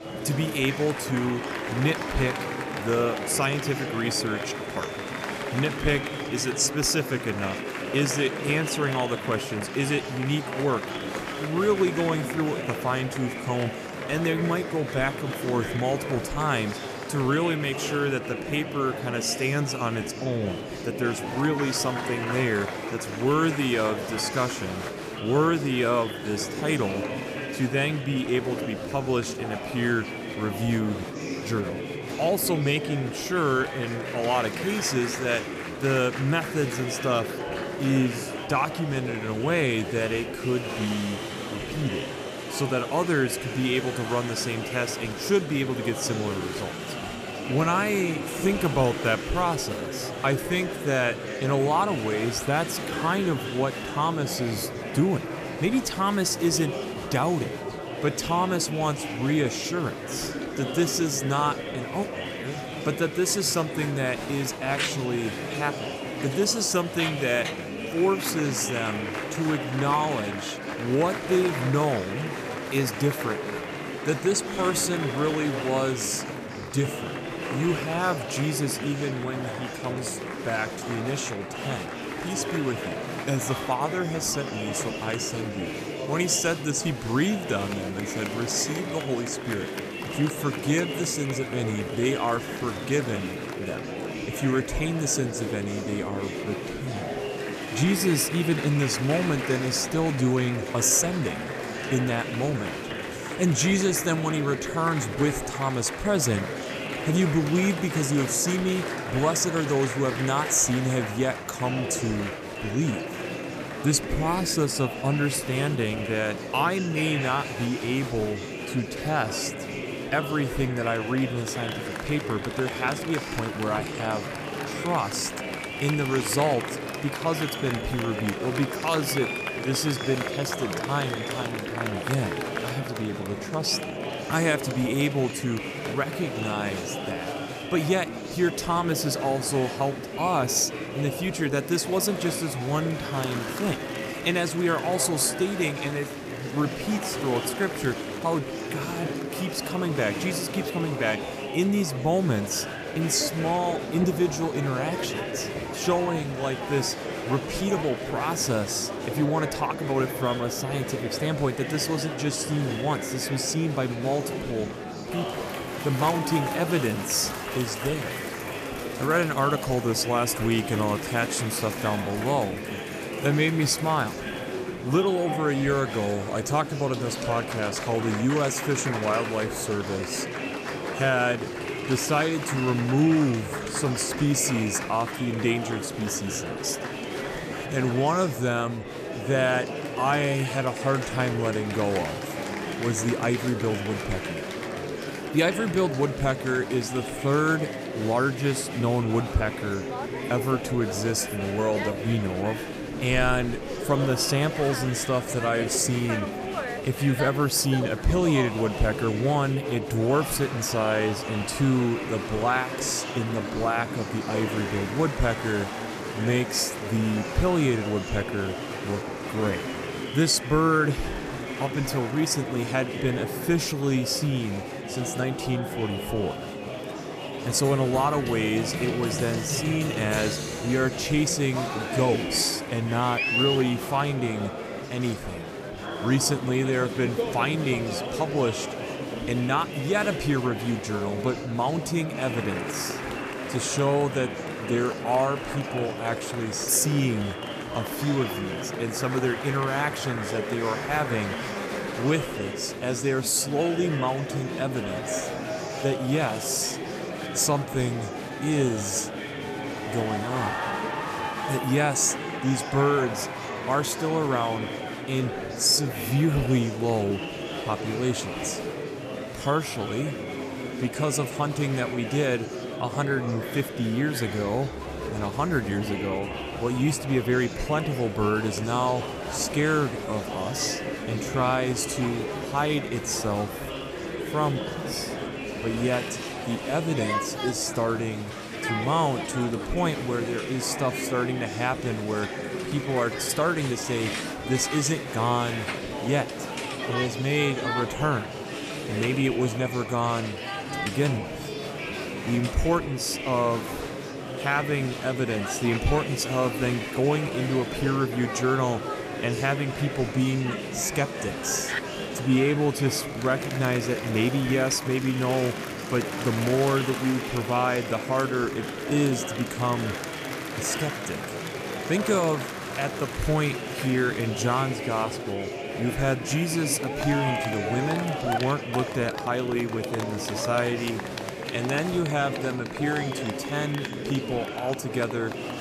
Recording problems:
murmuring crowd; loud; throughout; 5 dB below the speech

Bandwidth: 14.5 kHz